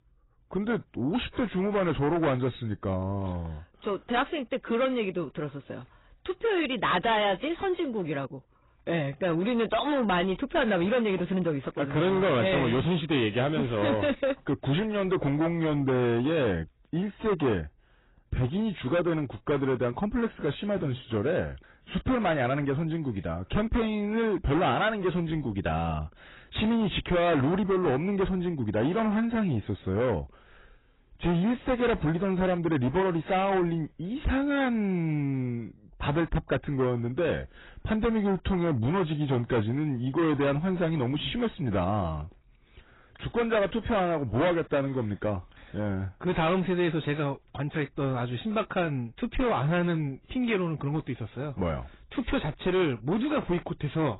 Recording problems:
distortion; heavy; 7 dB below the speech
garbled, watery; badly; nothing above 4 kHz

